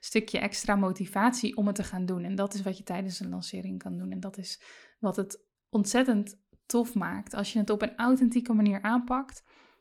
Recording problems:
none

